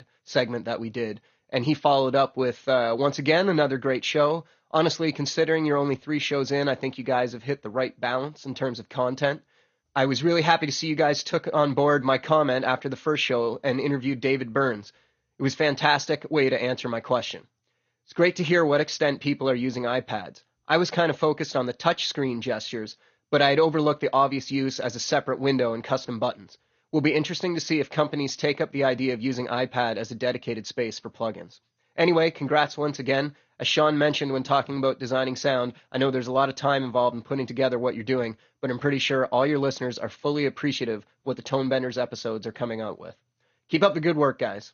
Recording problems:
garbled, watery; slightly; nothing above 6.5 kHz

